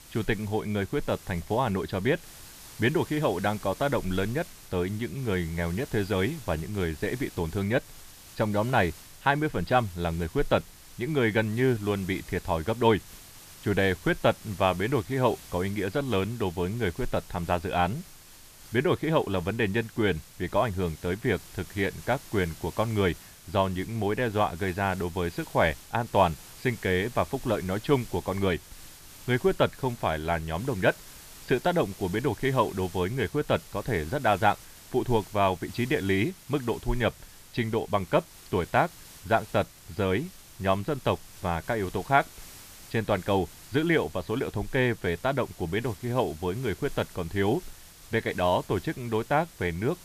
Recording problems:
high frequencies cut off; noticeable; nothing above 5.5 kHz
hiss; noticeable; throughout; 20 dB below the speech

